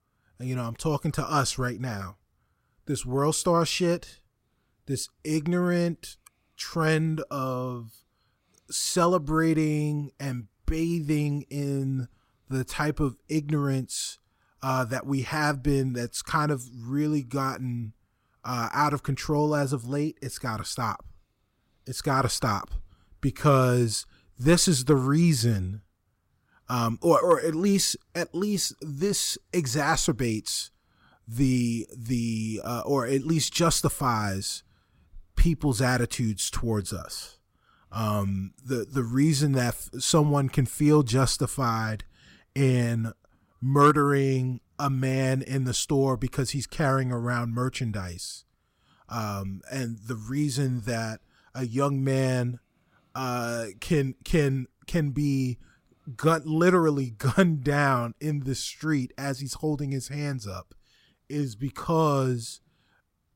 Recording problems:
none

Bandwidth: 16 kHz